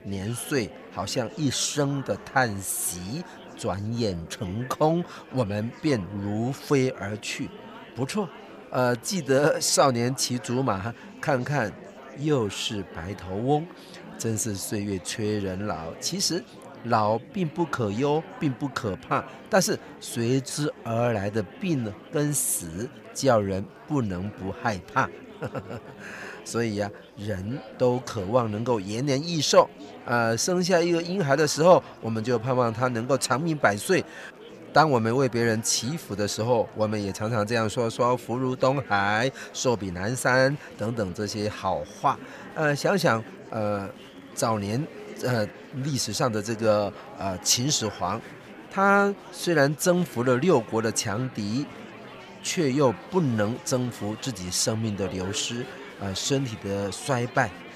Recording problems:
murmuring crowd; noticeable; throughout; 20 dB below the speech

